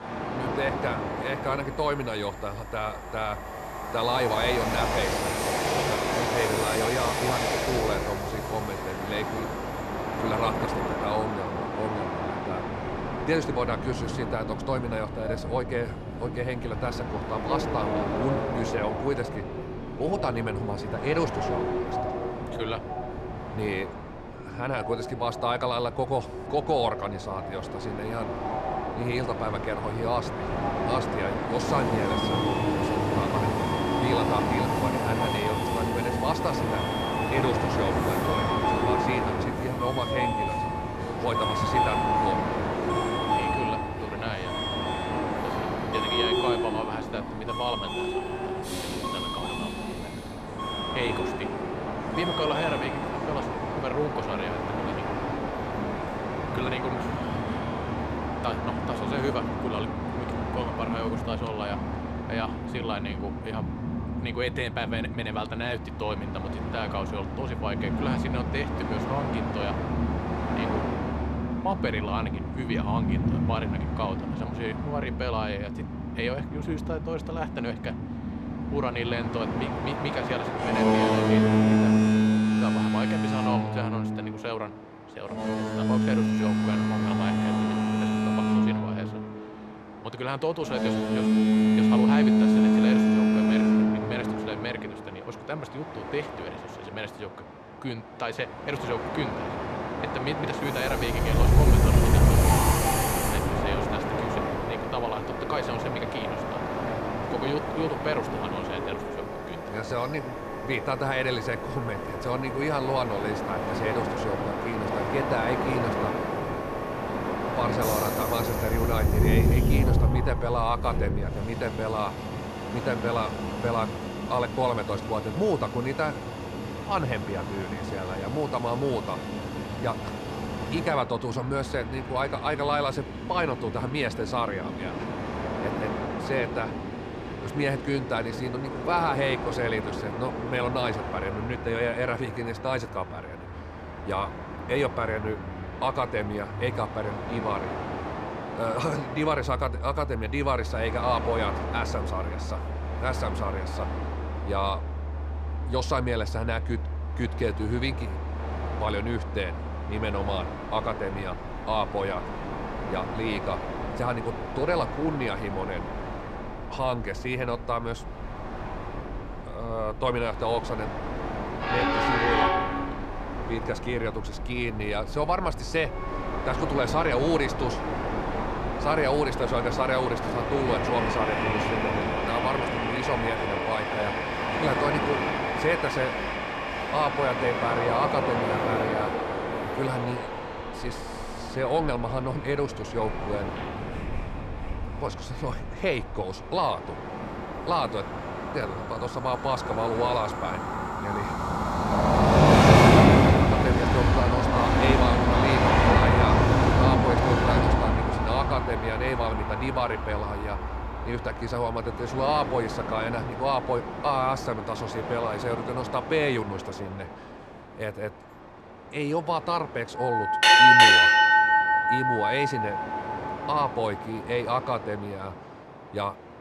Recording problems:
train or aircraft noise; very loud; throughout; 3 dB above the speech

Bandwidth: 14 kHz